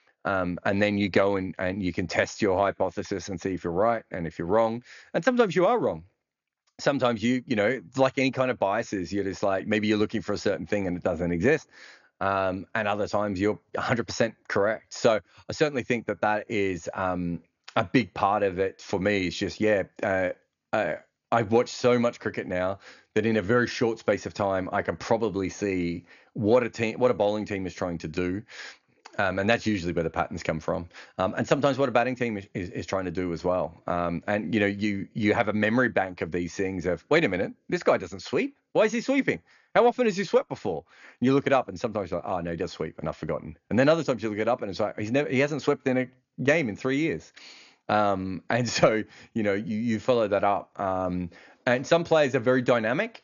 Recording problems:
high frequencies cut off; noticeable; nothing above 7 kHz

